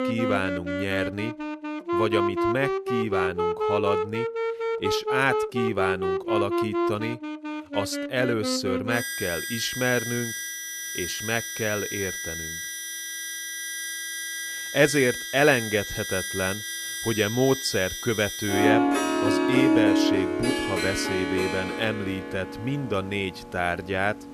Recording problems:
background music; loud; throughout; as loud as the speech

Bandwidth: 14 kHz